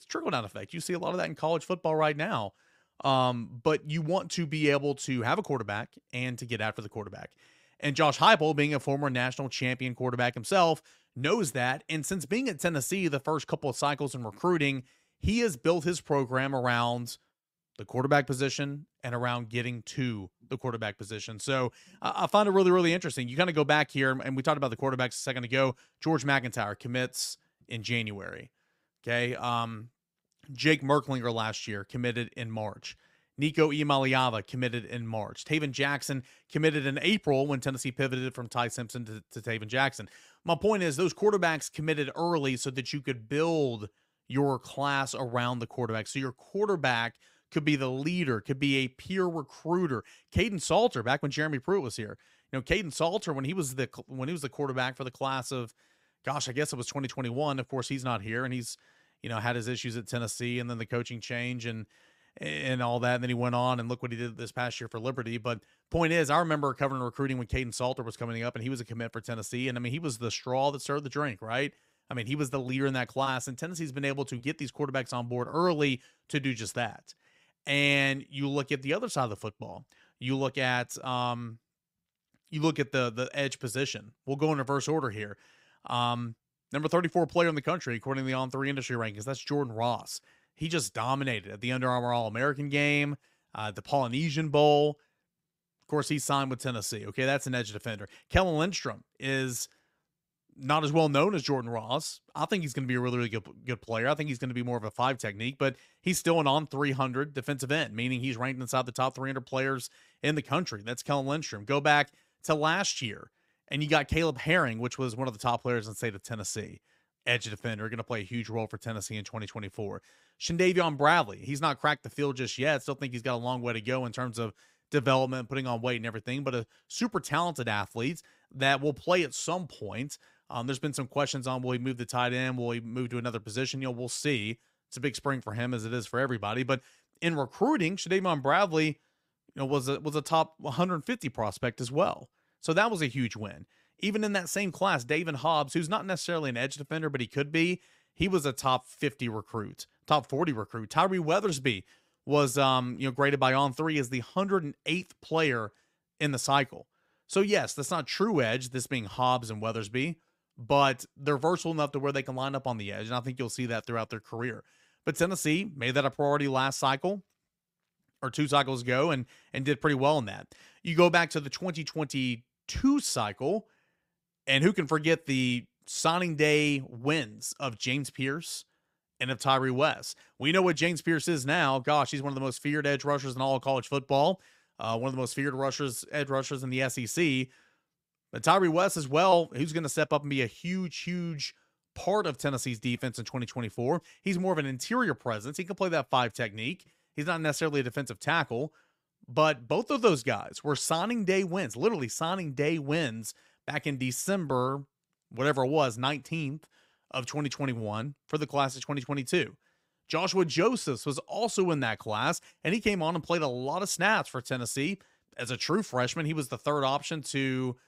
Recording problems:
none

